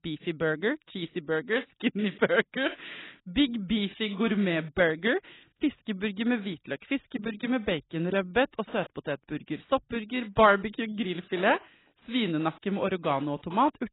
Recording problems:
garbled, watery; badly; nothing above 4 kHz

